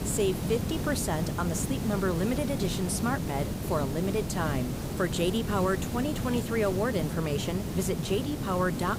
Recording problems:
hiss; loud; throughout; 3 dB below the speech

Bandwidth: 15.5 kHz